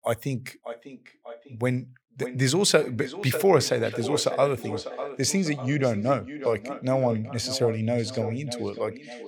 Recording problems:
echo of what is said; strong; throughout; 600 ms later, 10 dB below the speech

